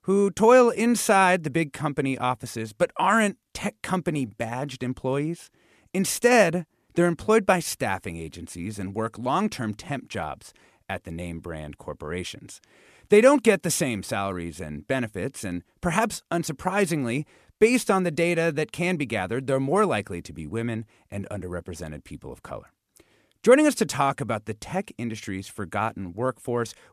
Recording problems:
none

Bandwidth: 14 kHz